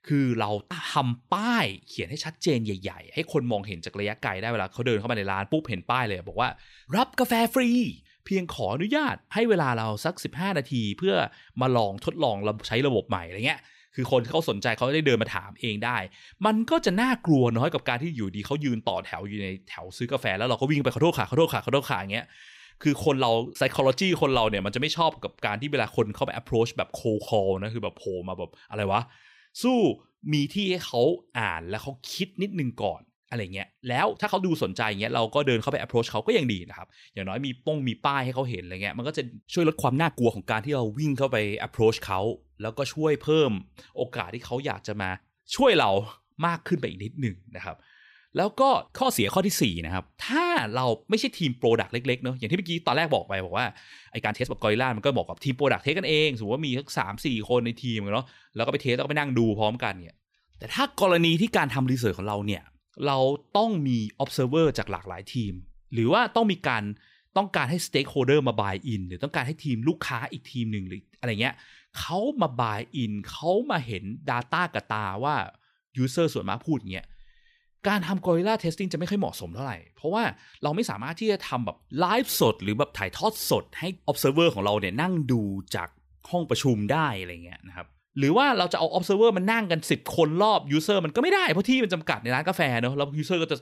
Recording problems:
uneven, jittery; strongly; from 1 s to 1:23

